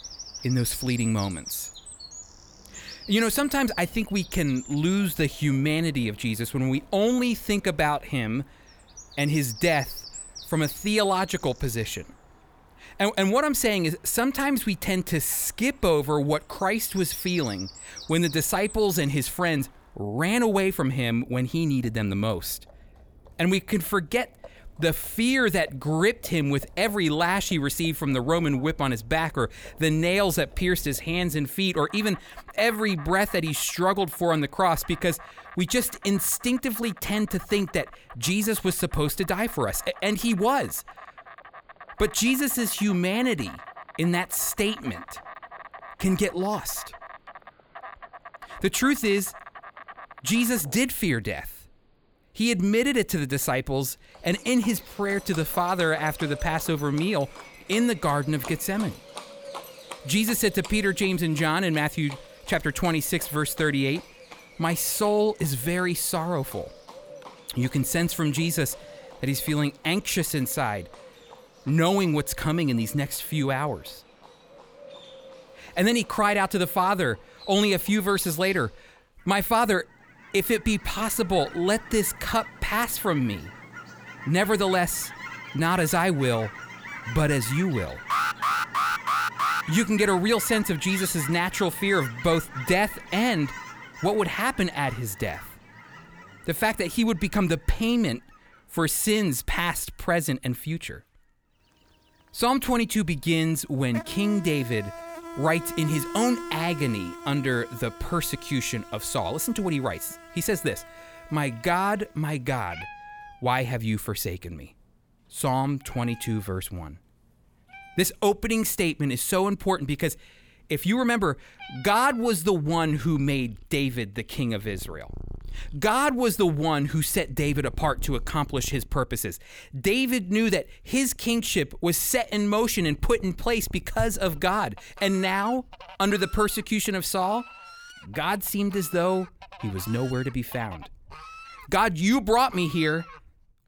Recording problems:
animal sounds; noticeable; throughout; 15 dB below the speech
alarm; loud; from 1:28 to 1:30; peak 1 dB above the speech

